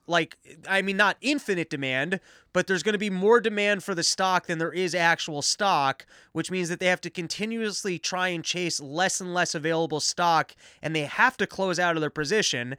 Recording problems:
none

